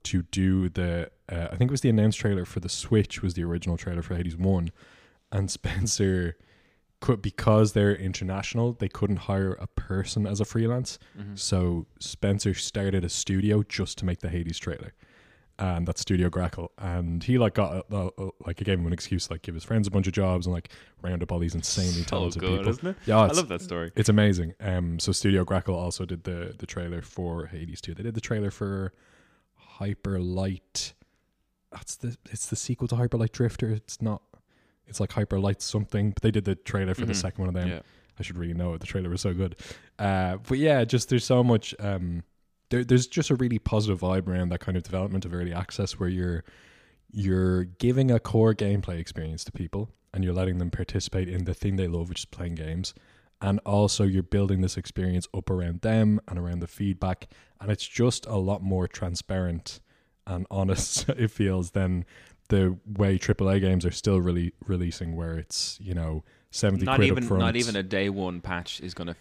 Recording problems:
none

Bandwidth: 15 kHz